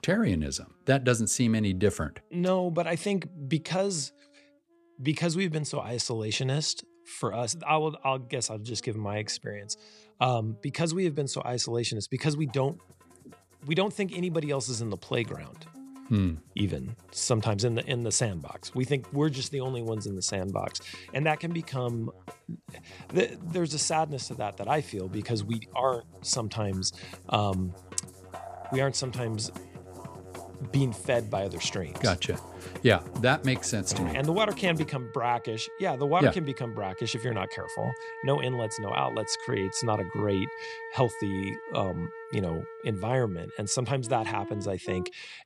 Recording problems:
background music; noticeable; throughout; 15 dB below the speech

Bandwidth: 14.5 kHz